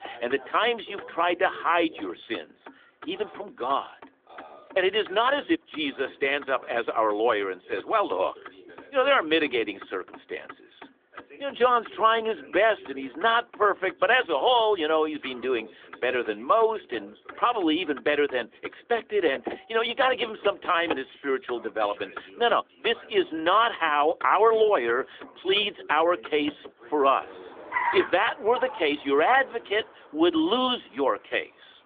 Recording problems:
phone-call audio; nothing above 3.5 kHz
traffic noise; noticeable; throughout; 15 dB below the speech
voice in the background; faint; throughout; 25 dB below the speech

